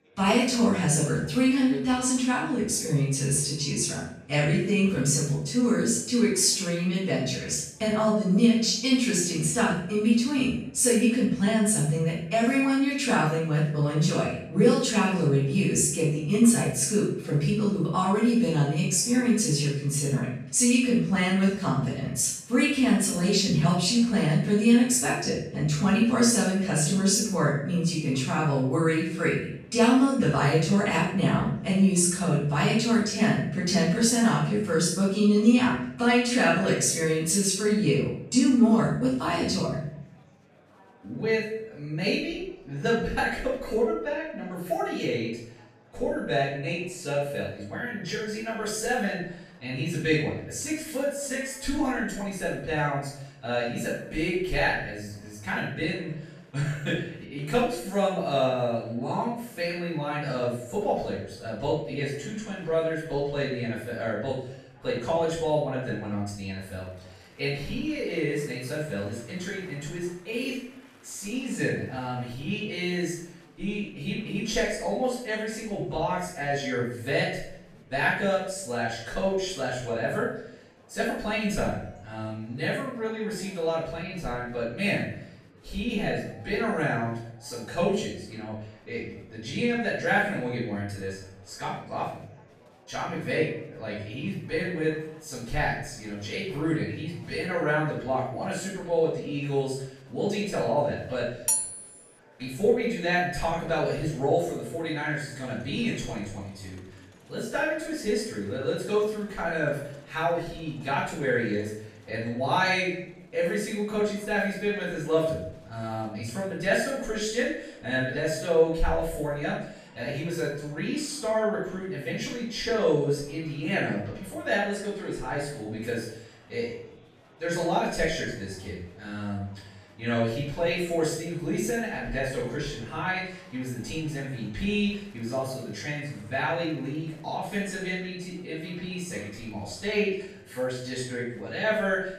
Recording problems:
off-mic speech; far
room echo; noticeable; dies away in 0.6 s
murmuring crowd; faint; throughout; 30 dB below the speech
clattering dishes; loud; at 1:41; peak 2 dB above the speech

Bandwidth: 14 kHz